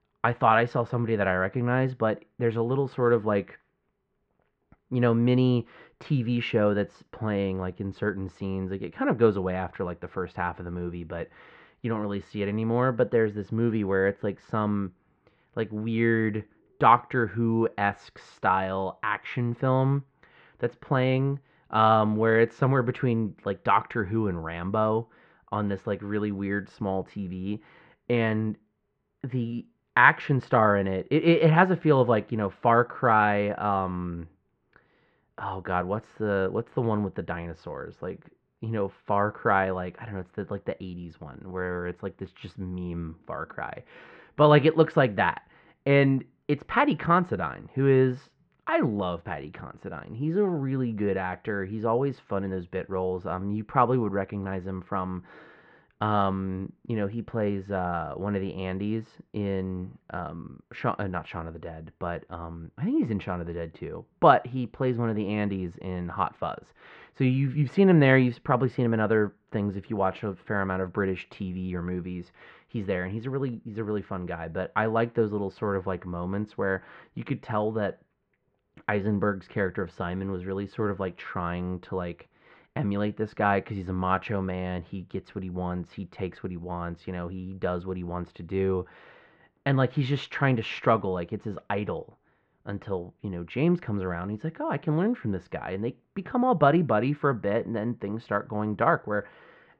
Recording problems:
muffled; very; fading above 2 kHz

